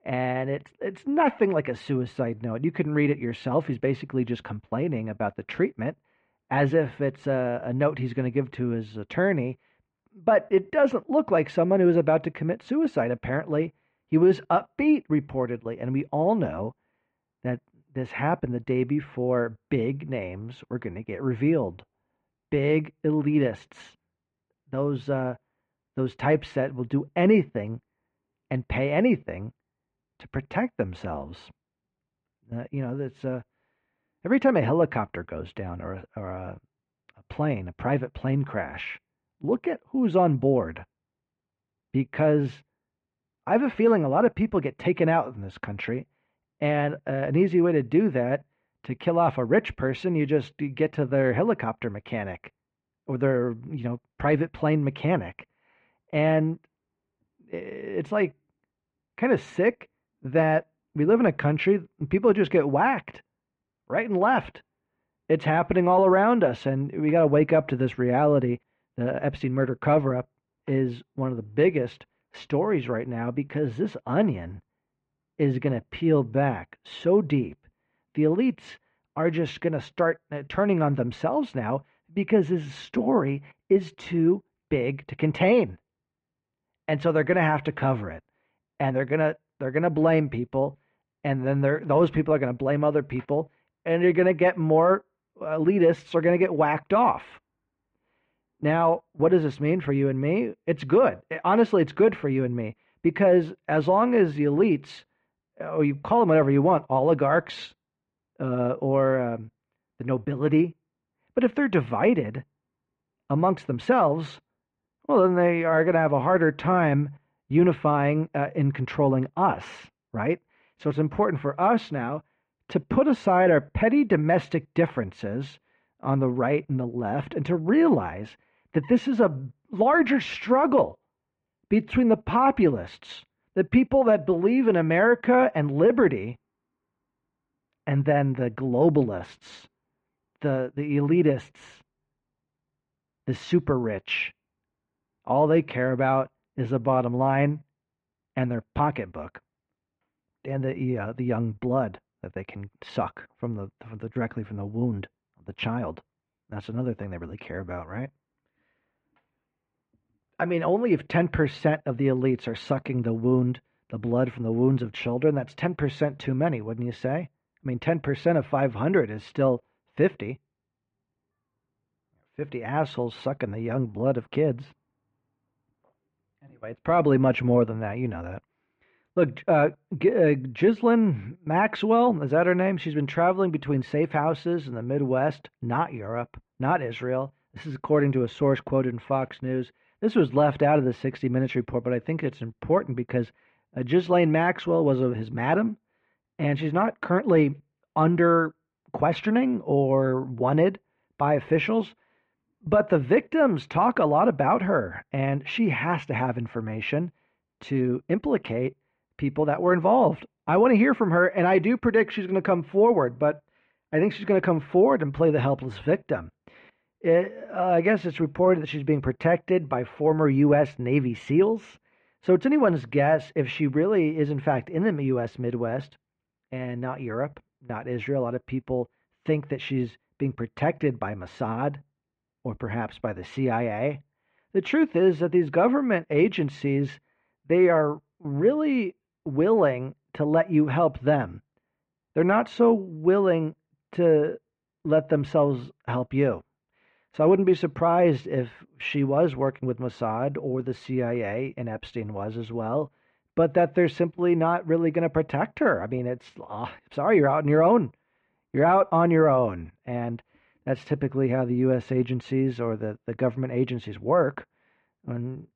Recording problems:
muffled; very; fading above 2.5 kHz

